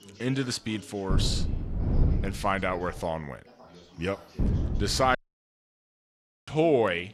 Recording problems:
wind noise on the microphone; occasional gusts; from 1 to 3 s and at 4.5 s; 15 dB below the speech
background chatter; faint; throughout; 3 voices, 20 dB below the speech
audio cutting out; at 5 s for 1.5 s

